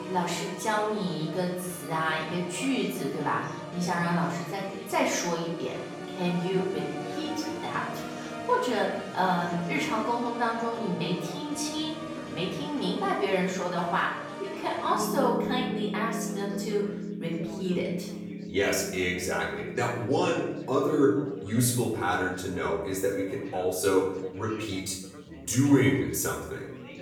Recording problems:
off-mic speech; far
room echo; noticeable; dies away in 0.7 s
background music; loud; throughout; 9 dB below the speech
chatter from many people; noticeable; throughout; 15 dB below the speech

